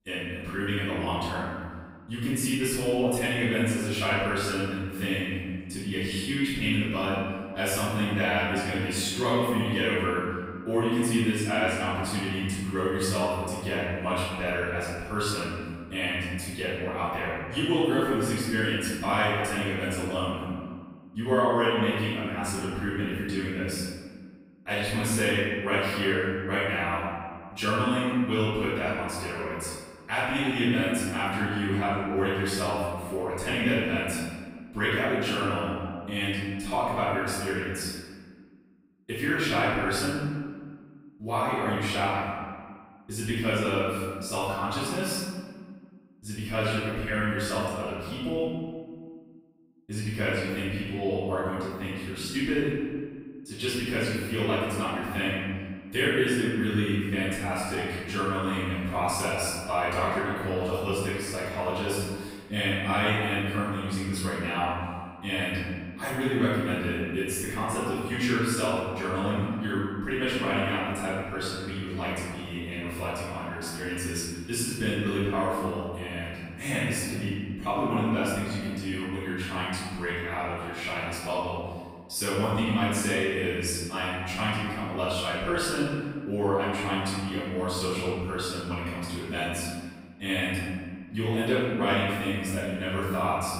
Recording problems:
room echo; strong; dies away in 1.6 s
off-mic speech; far

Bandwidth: 15.5 kHz